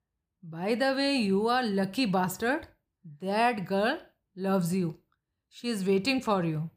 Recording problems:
none

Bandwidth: 15 kHz